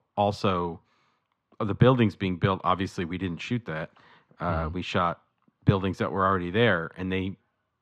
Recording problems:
muffled; slightly; fading above 3 kHz

